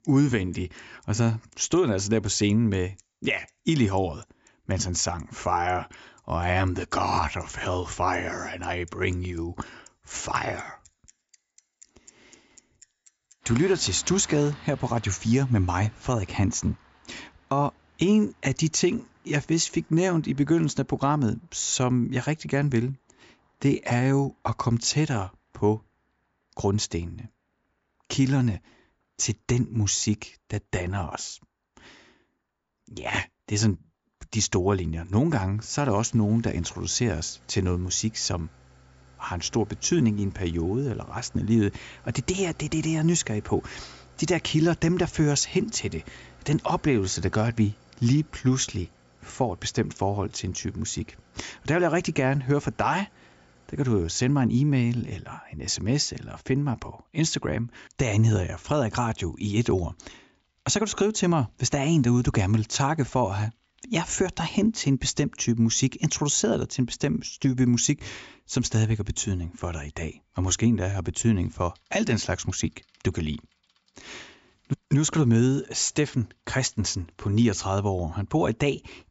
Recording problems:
high frequencies cut off; noticeable; nothing above 8 kHz
traffic noise; faint; throughout; 30 dB below the speech

